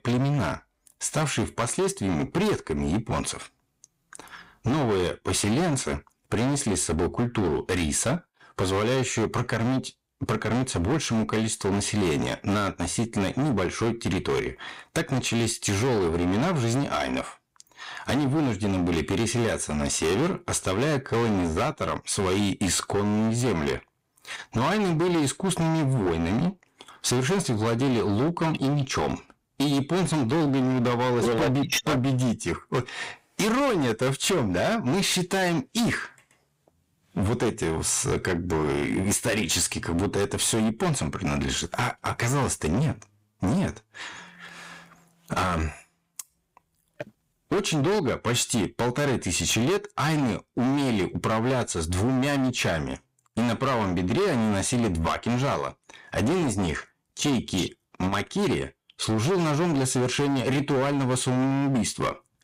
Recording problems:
distortion; heavy; 21% of the sound clipped

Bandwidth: 15.5 kHz